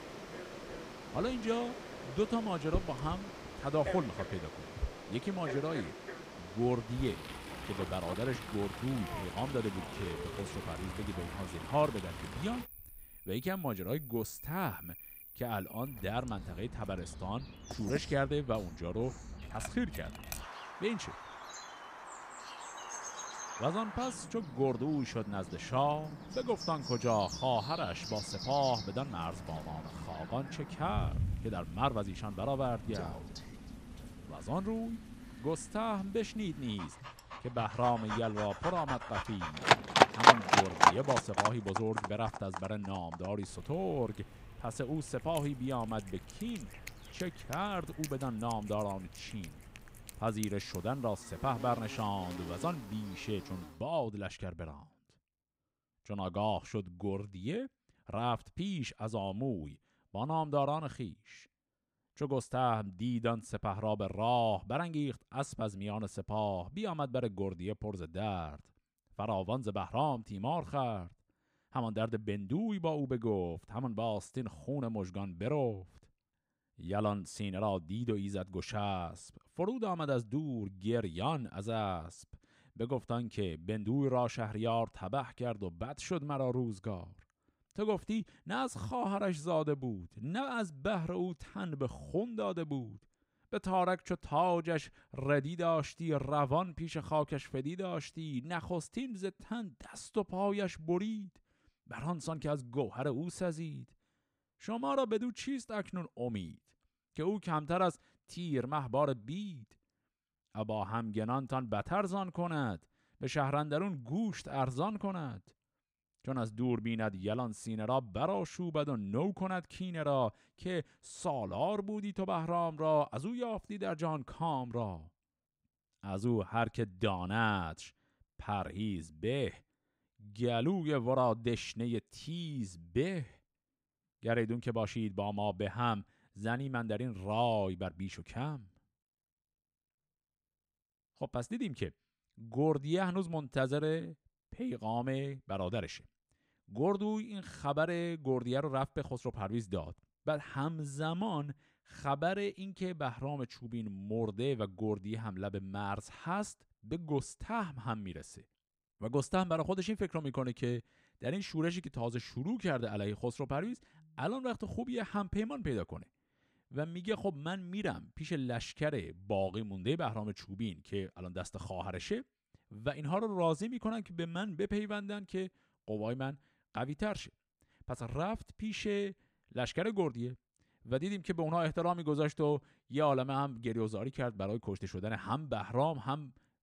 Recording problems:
animal sounds; loud; until 54 s; 1 dB below the speech

